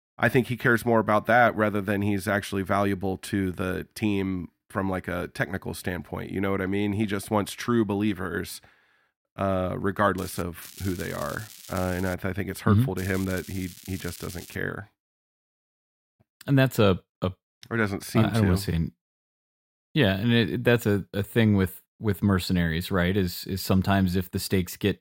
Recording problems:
crackling; noticeable; at 10 s, from 11 to 12 s and from 13 to 15 s; 15 dB below the speech

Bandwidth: 16 kHz